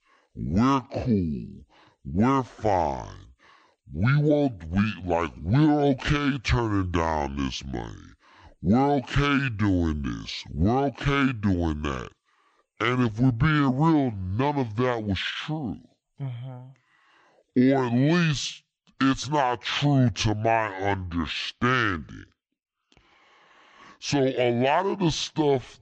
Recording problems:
wrong speed and pitch; too slow and too low; 0.7 times normal speed

